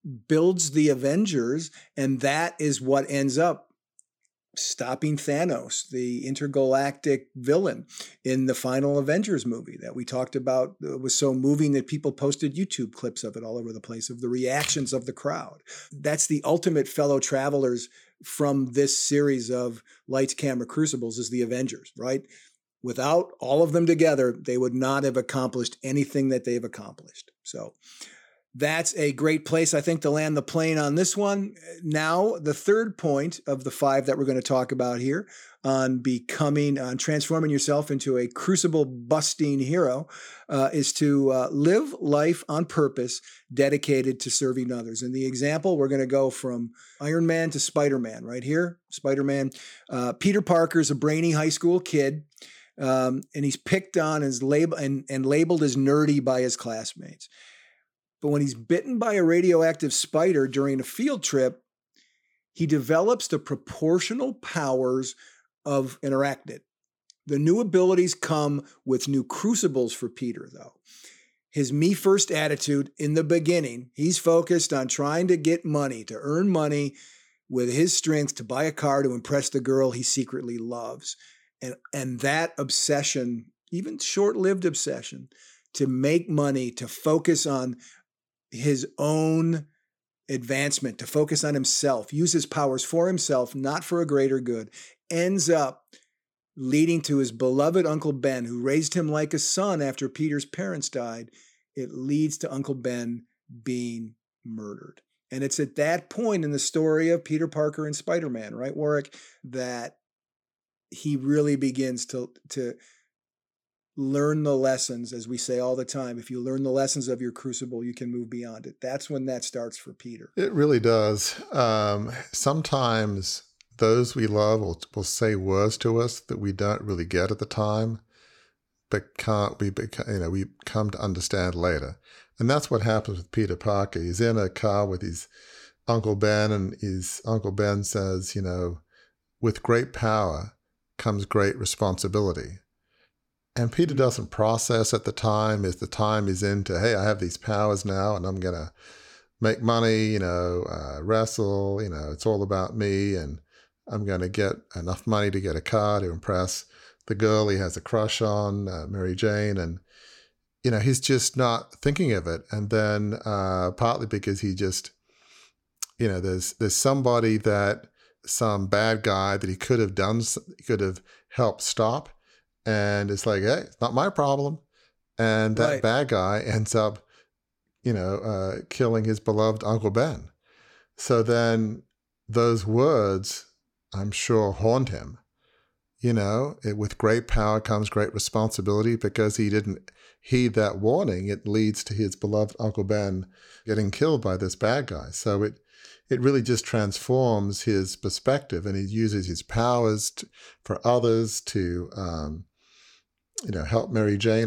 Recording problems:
abrupt cut into speech; at the end

